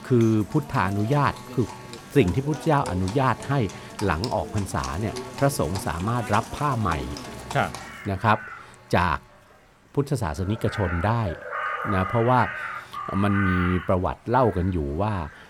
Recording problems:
animal sounds; loud; throughout; 10 dB below the speech
alarms or sirens; faint; throughout; 20 dB below the speech
rain or running water; faint; throughout; 30 dB below the speech

